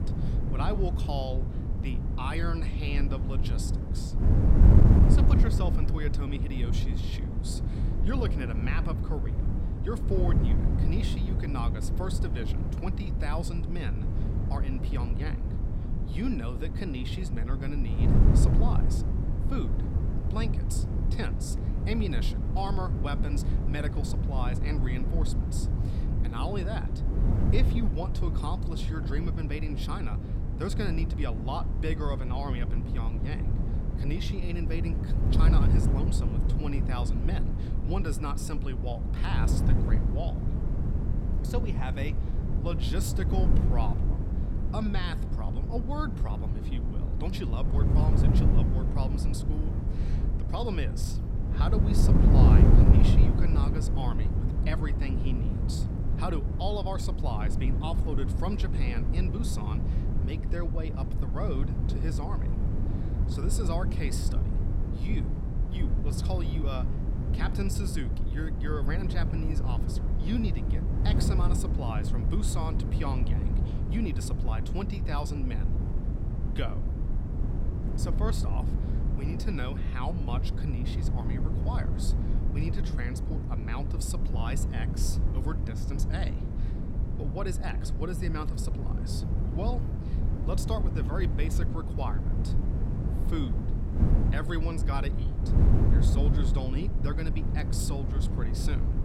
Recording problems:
wind noise on the microphone; heavy; 2 dB below the speech

